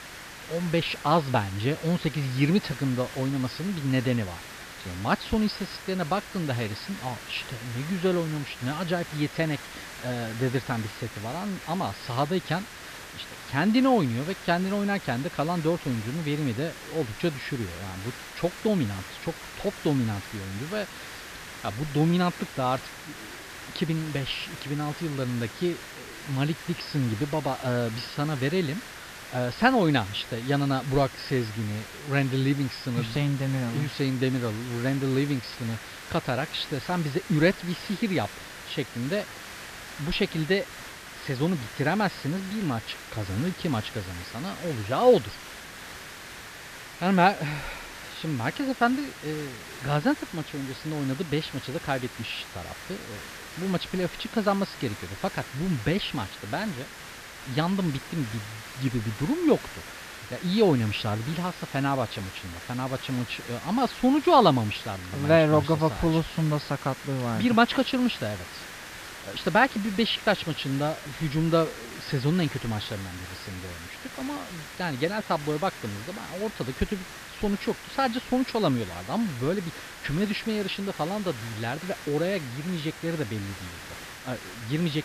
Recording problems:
high frequencies cut off; noticeable; nothing above 5.5 kHz
hiss; noticeable; throughout; 10 dB below the speech

